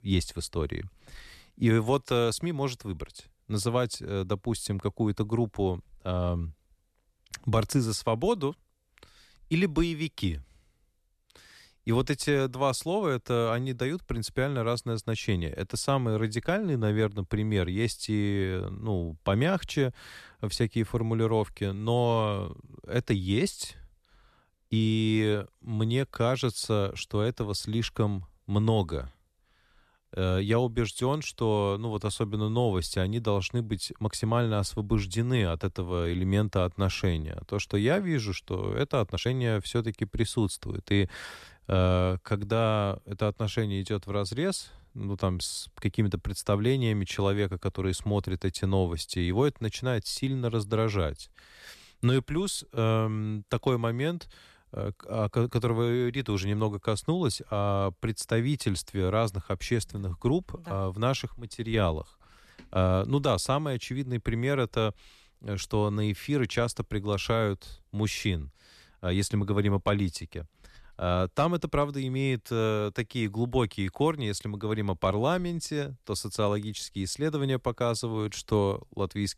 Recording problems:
uneven, jittery; slightly; from 25 to 39 s

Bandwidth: 13.5 kHz